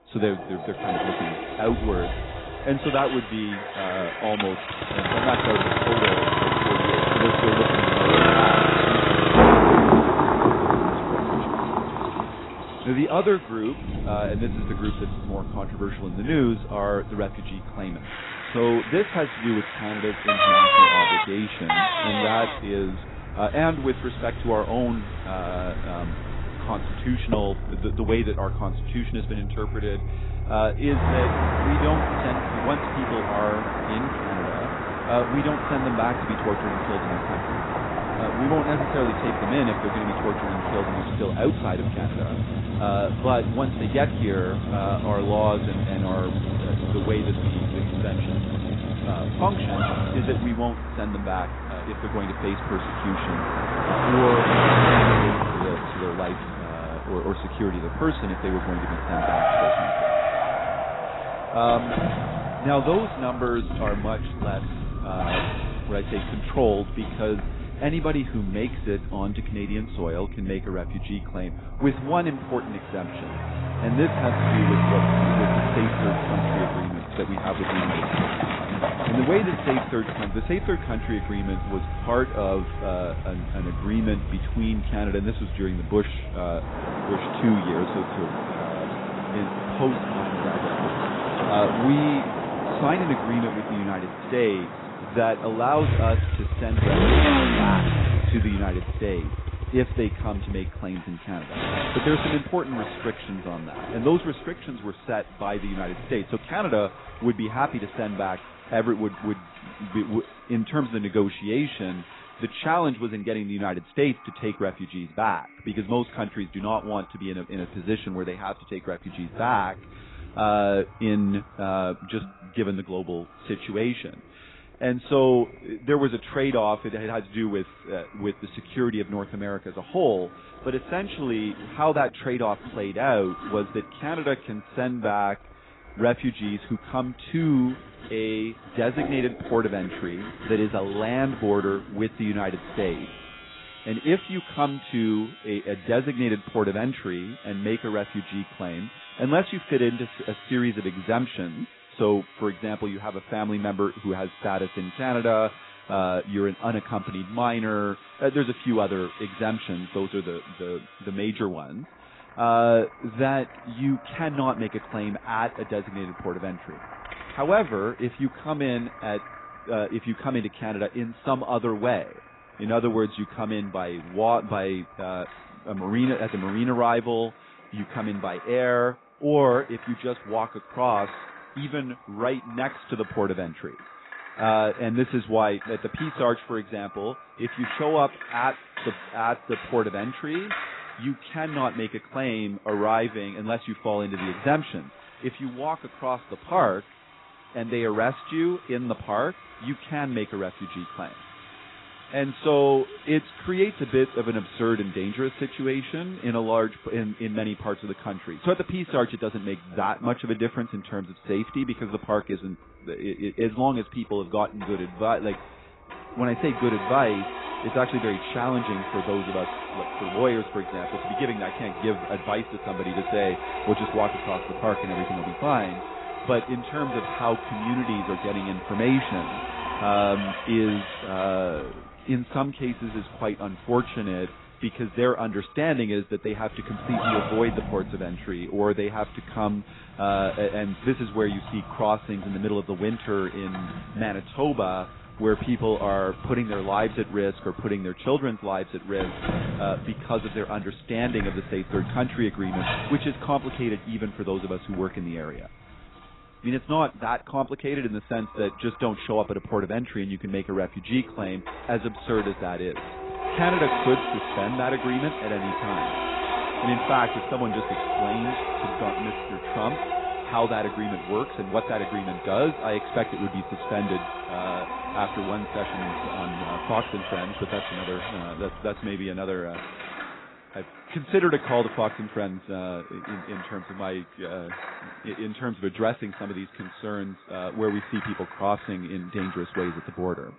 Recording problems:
garbled, watery; badly; nothing above 4 kHz
echo of what is said; faint; throughout; 450 ms later, 25 dB below the speech
traffic noise; very loud; until 1:42; 3 dB above the speech
household noises; loud; throughout; 9 dB below the speech

